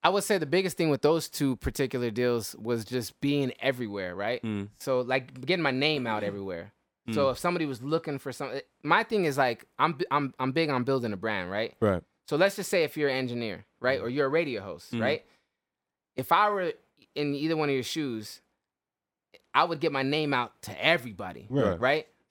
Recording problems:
none

